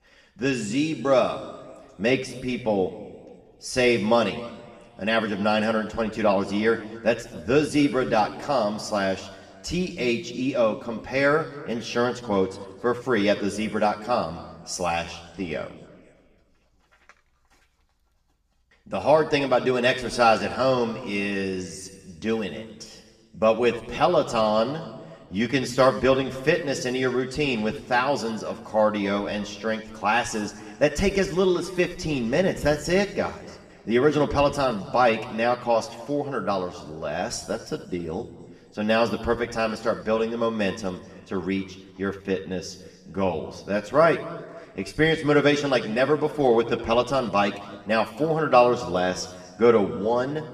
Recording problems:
room echo; slight; dies away in 1.4 s
off-mic speech; somewhat distant

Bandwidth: 14.5 kHz